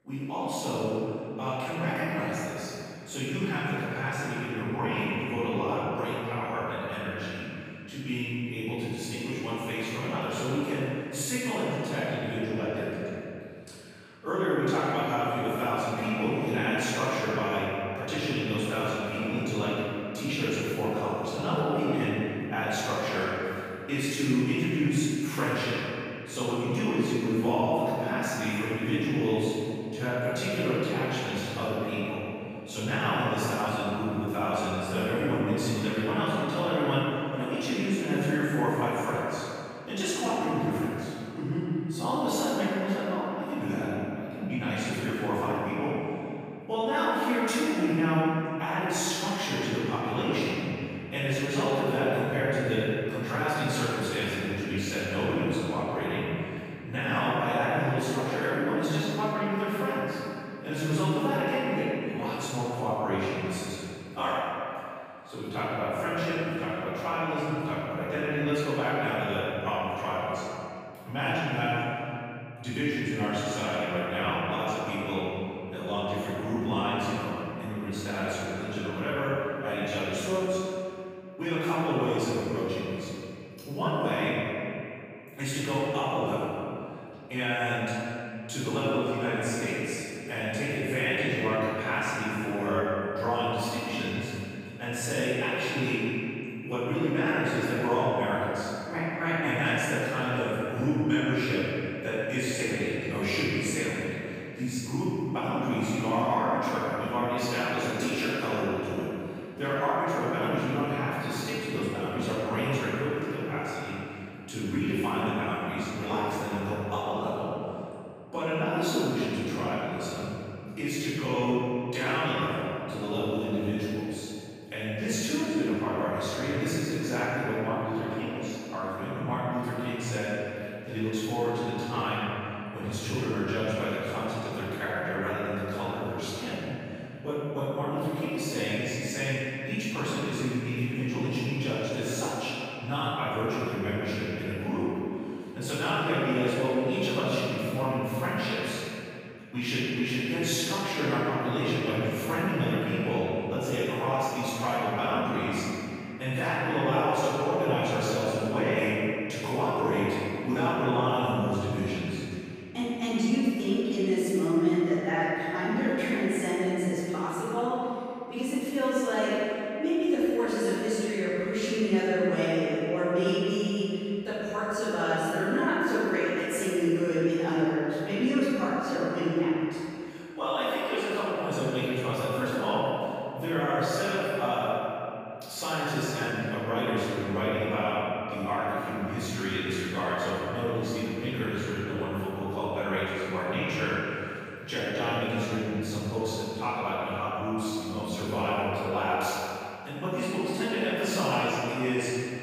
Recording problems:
room echo; strong; dies away in 2.5 s
off-mic speech; far

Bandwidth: 15 kHz